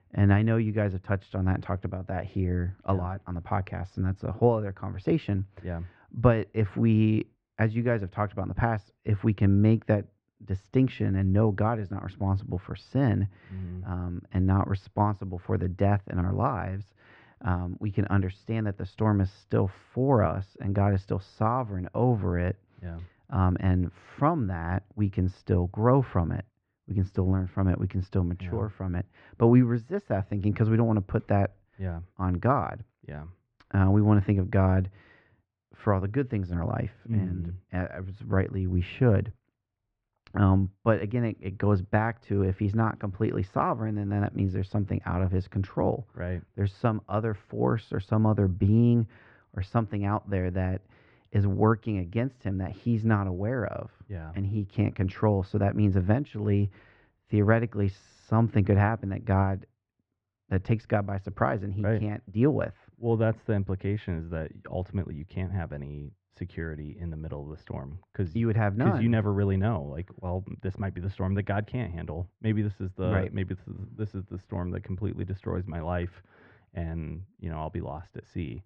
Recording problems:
muffled; very; fading above 2 kHz

